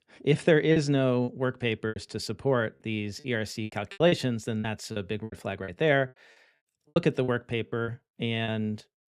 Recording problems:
choppy; very; 11% of the speech affected

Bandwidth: 15 kHz